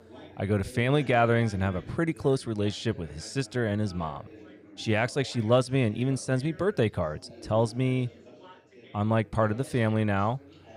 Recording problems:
chatter from many people; faint; throughout; 20 dB below the speech

